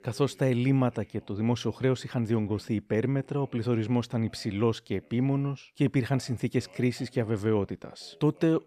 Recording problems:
voice in the background; faint; throughout; 30 dB below the speech

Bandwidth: 14 kHz